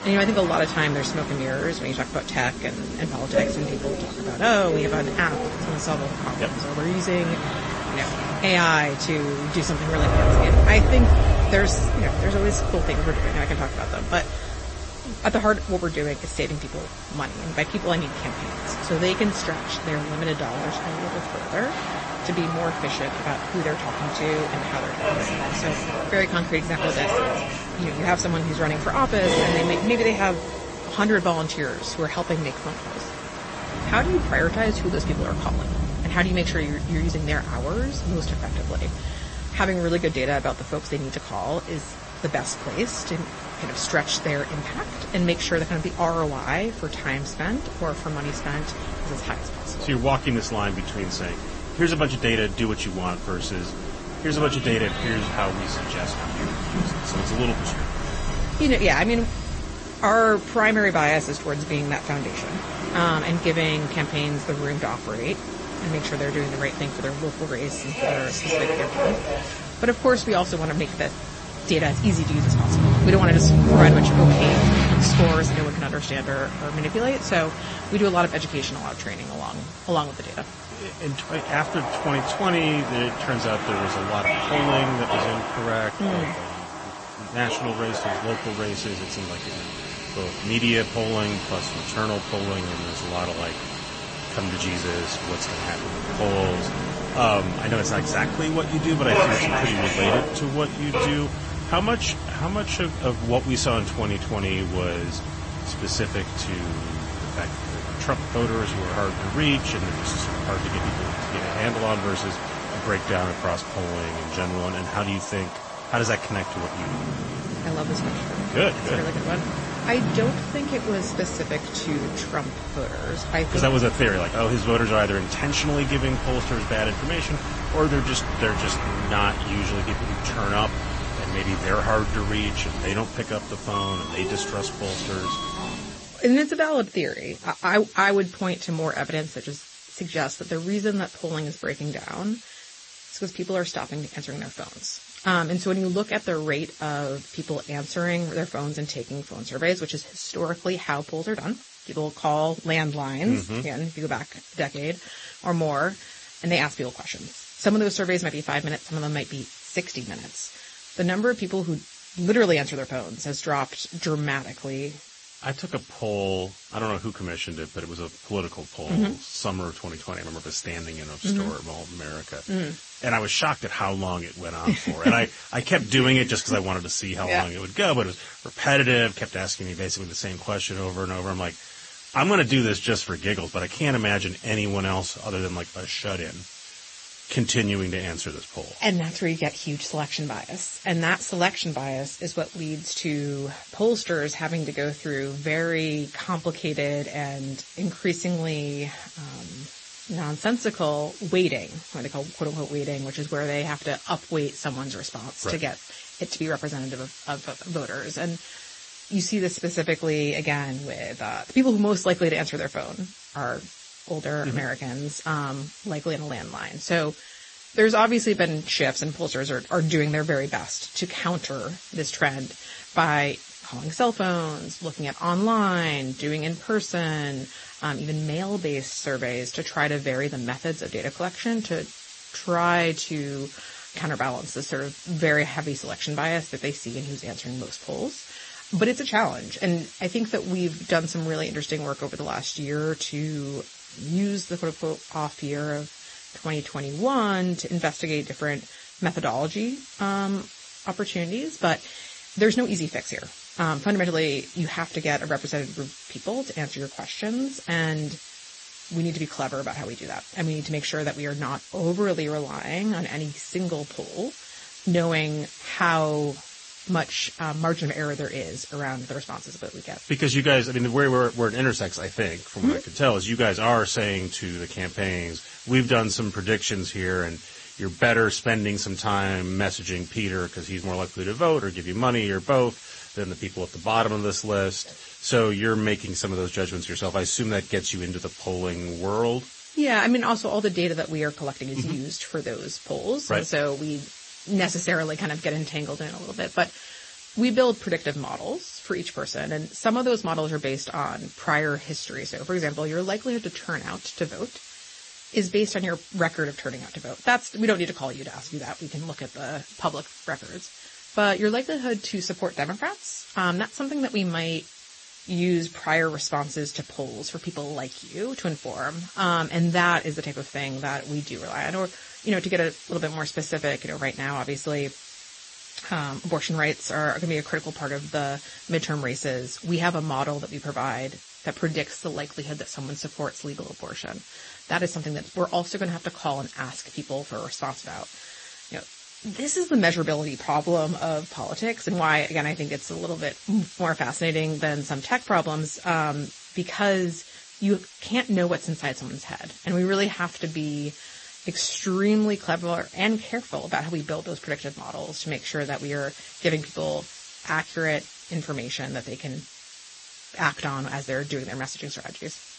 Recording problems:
garbled, watery; slightly; nothing above 8 kHz
train or aircraft noise; loud; until 2:16; 2 dB below the speech
hiss; noticeable; throughout; 15 dB below the speech

